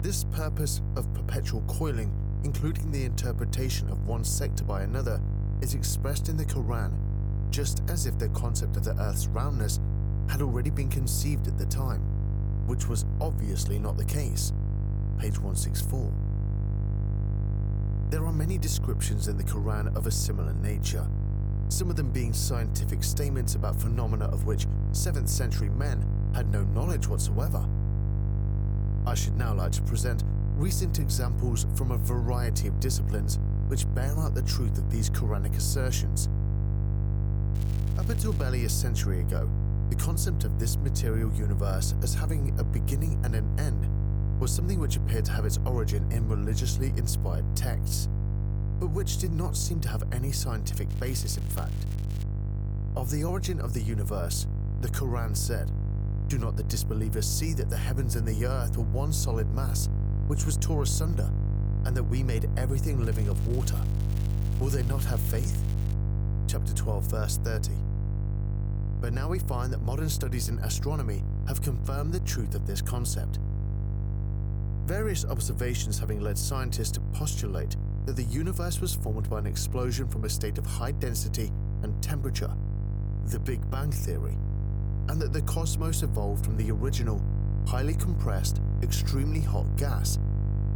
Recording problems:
electrical hum; loud; throughout; 50 Hz, 6 dB below the speech
crackling; noticeable; at 38 s, from 51 to 52 s and from 1:03 to 1:06; 15 dB below the speech

